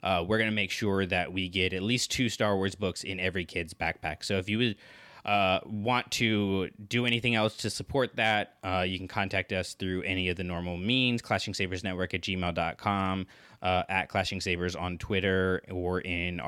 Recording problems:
abrupt cut into speech; at the end

